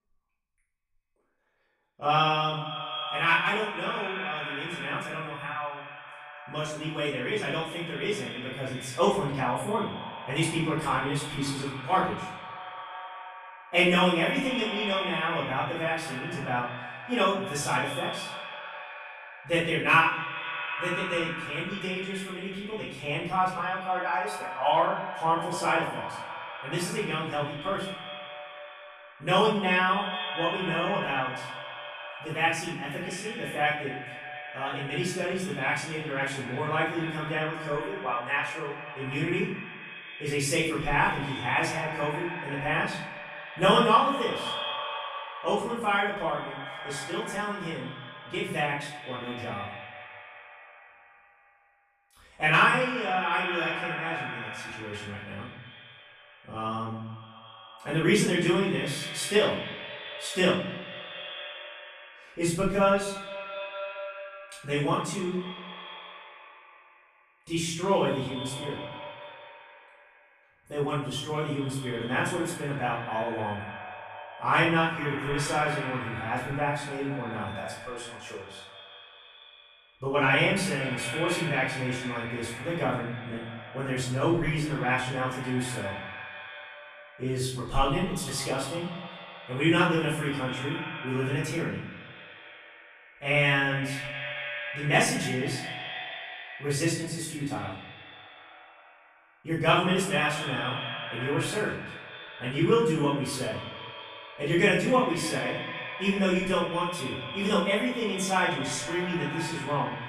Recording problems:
echo of what is said; strong; throughout; 220 ms later, 9 dB below the speech
off-mic speech; far
room echo; noticeable; dies away in 0.6 s

